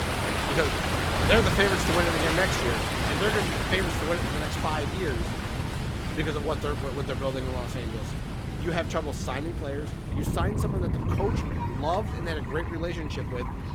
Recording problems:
garbled, watery; slightly; nothing above 18 kHz
rain or running water; loud; throughout; as loud as the speech
wind noise on the microphone; occasional gusts; 10 dB below the speech
crowd noise; faint; throughout; 20 dB below the speech

